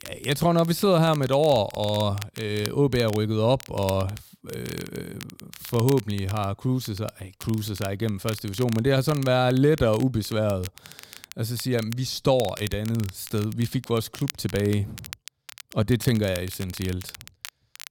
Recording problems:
crackle, like an old record; noticeable; 15 dB below the speech

